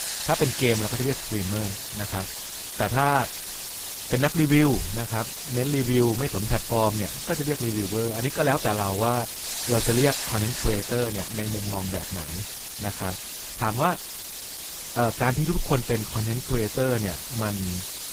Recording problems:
garbled, watery; slightly; nothing above 15.5 kHz
hiss; loud; throughout; 4 dB below the speech

